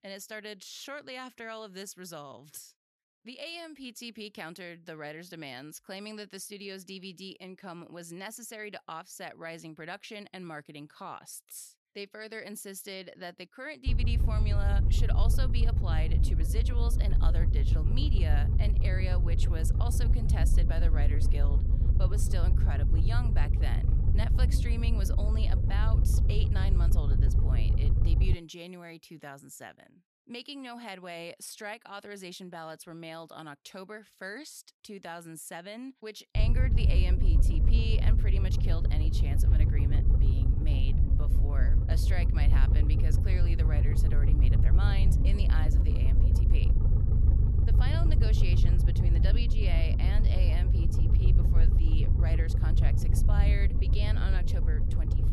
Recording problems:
low rumble; loud; from 14 to 28 s and from 36 s on; 2 dB below the speech

